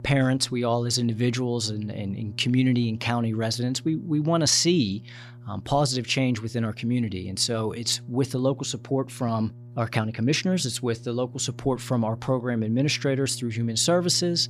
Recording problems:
electrical hum; faint; throughout; 60 Hz, 25 dB below the speech

